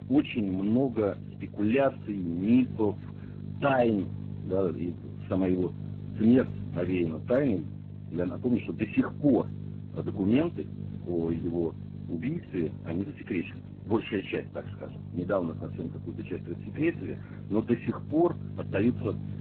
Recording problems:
garbled, watery; badly
electrical hum; noticeable; throughout; 50 Hz, 20 dB below the speech

